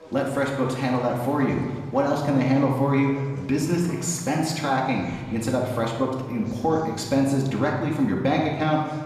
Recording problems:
off-mic speech; far
room echo; noticeable; dies away in 1.2 s
chatter from many people; faint; throughout; 20 dB below the speech

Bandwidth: 14.5 kHz